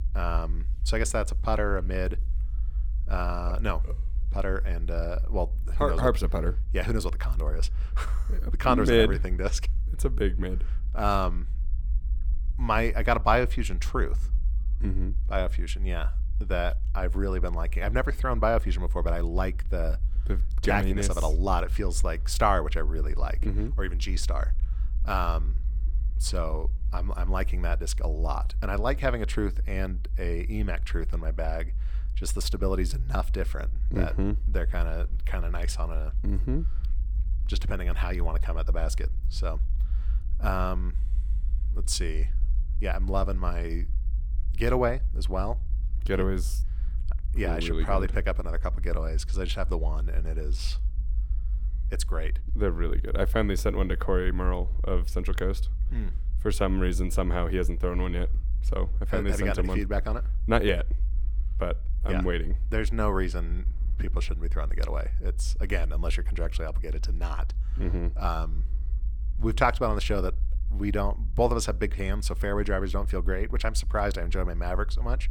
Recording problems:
low rumble; faint; throughout; 20 dB below the speech

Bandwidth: 17.5 kHz